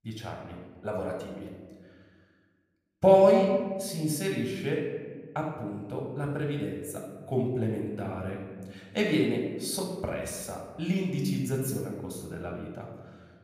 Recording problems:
room echo; noticeable; dies away in 1.2 s
off-mic speech; somewhat distant

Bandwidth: 15 kHz